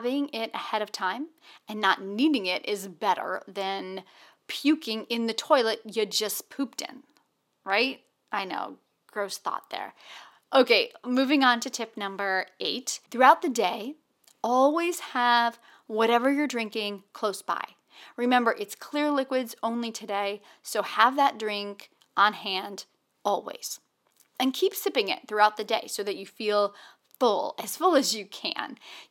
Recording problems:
thin; very slightly; fading below 350 Hz
abrupt cut into speech; at the start

